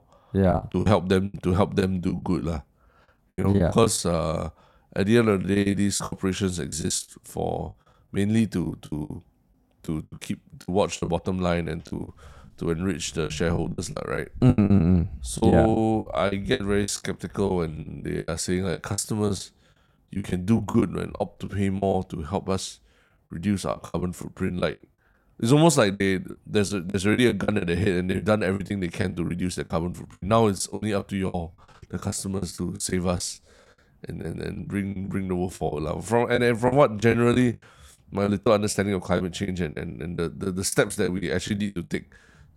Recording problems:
choppy; very; 13% of the speech affected

